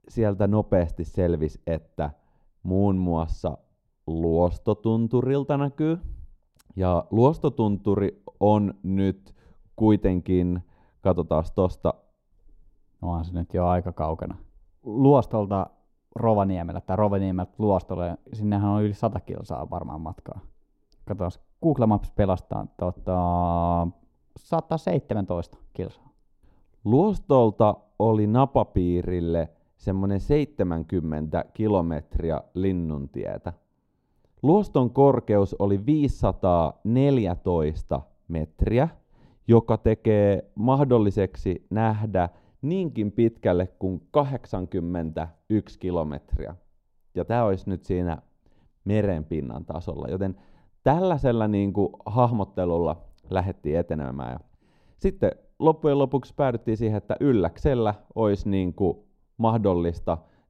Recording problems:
muffled; very; fading above 1 kHz

